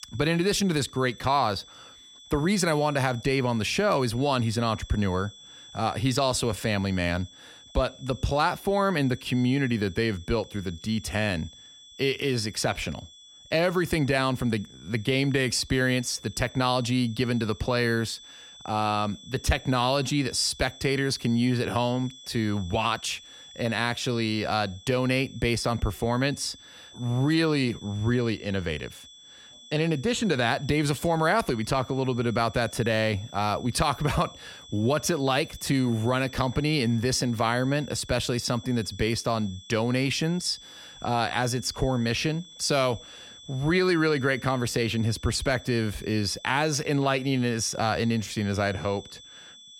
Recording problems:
high-pitched whine; noticeable; throughout; 3.5 kHz, 20 dB below the speech

